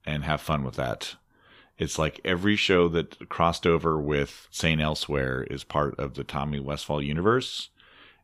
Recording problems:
none

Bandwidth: 14.5 kHz